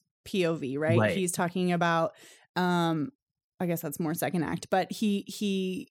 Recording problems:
none

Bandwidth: 18 kHz